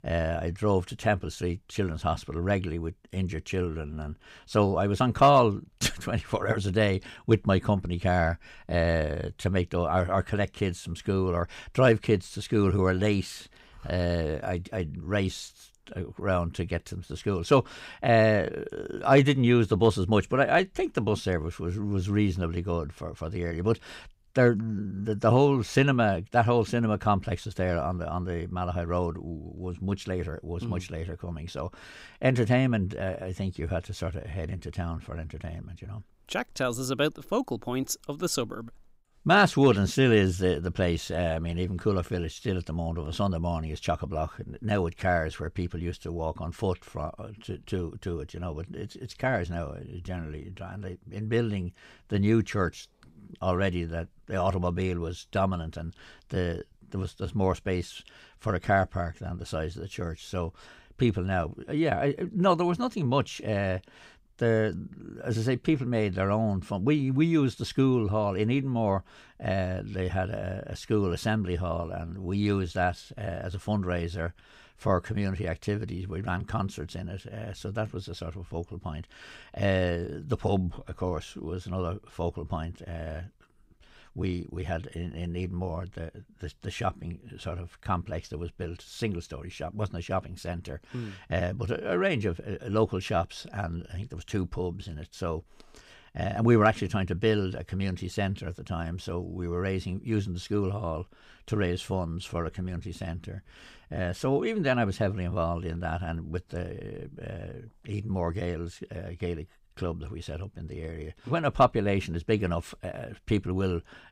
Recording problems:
none

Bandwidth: 15.5 kHz